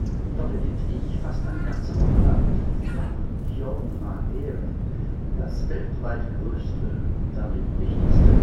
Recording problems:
off-mic speech; far
room echo; noticeable; dies away in 0.6 s
wind noise on the microphone; heavy; 3 dB above the speech
animal sounds; loud; until 5 s; 9 dB below the speech

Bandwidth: 16 kHz